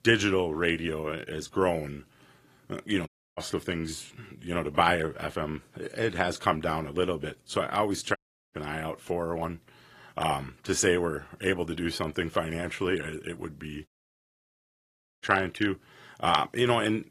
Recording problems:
garbled, watery; slightly
audio cutting out; at 3 s, at 8 s and at 14 s for 1.5 s

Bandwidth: 15 kHz